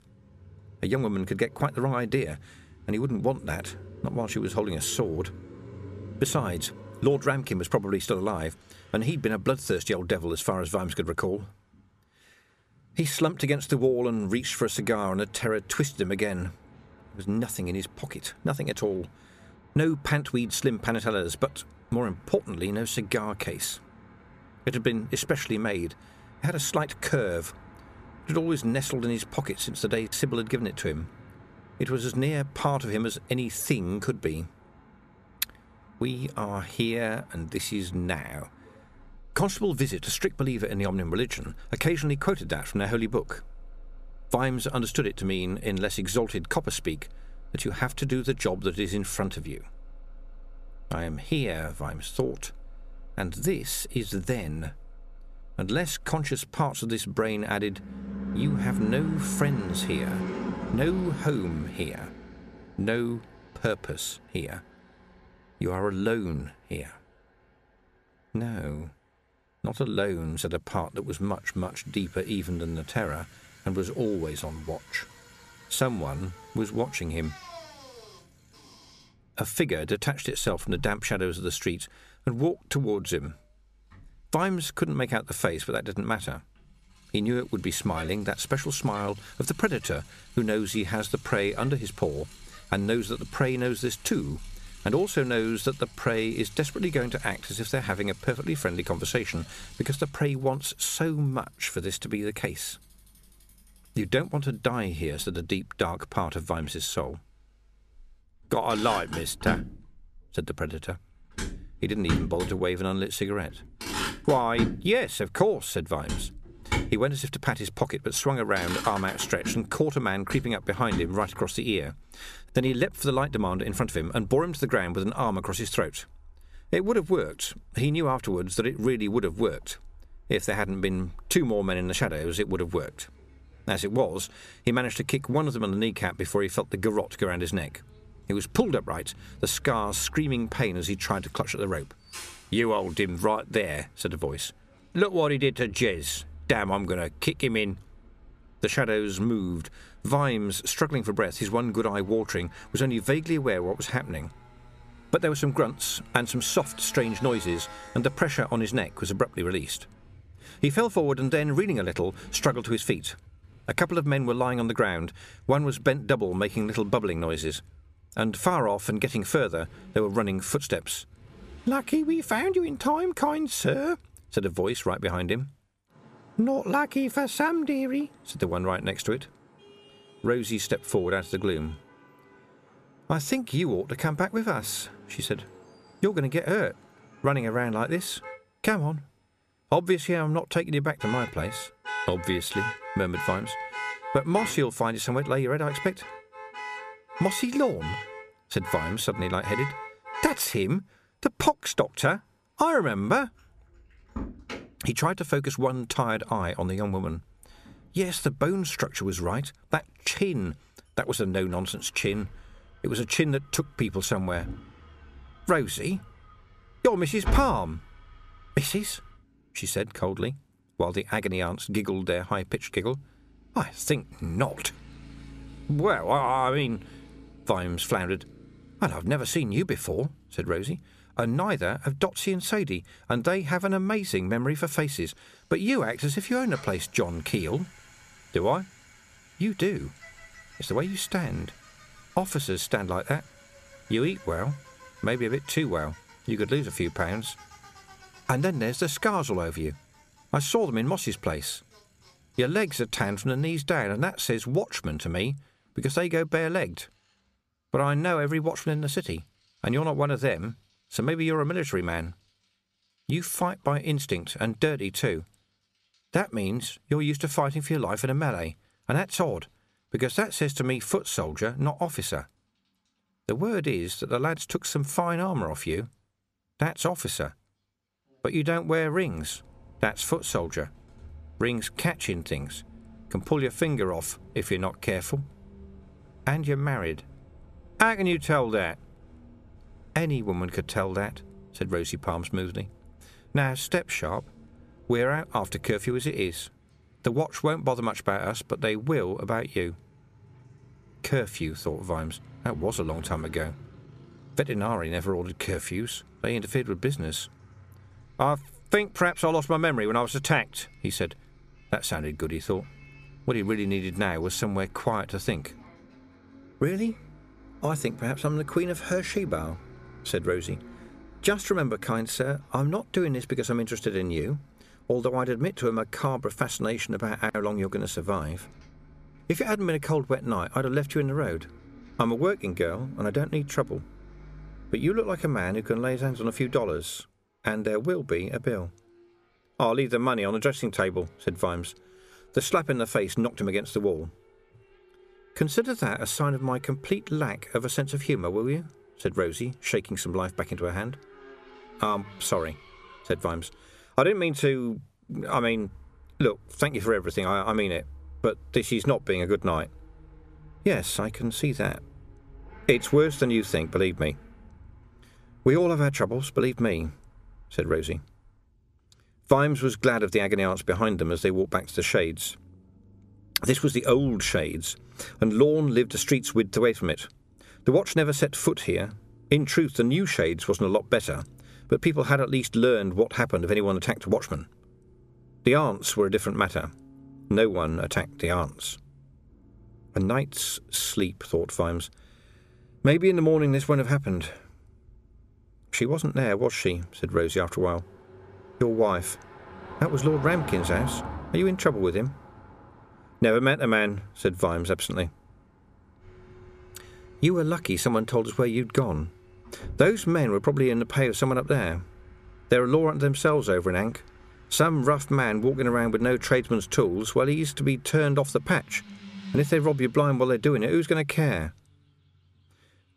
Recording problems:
traffic noise; noticeable; throughout; 15 dB below the speech

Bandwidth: 14.5 kHz